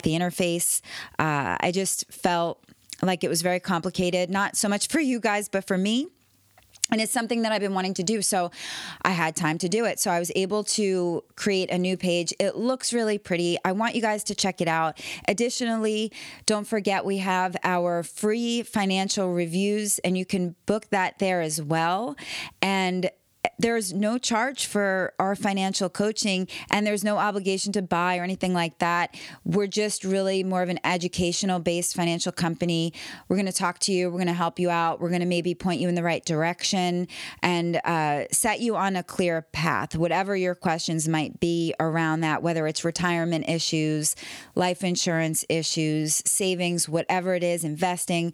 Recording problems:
squashed, flat; somewhat

